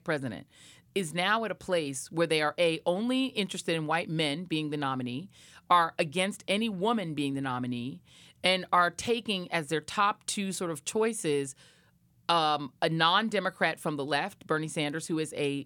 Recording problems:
none

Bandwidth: 17 kHz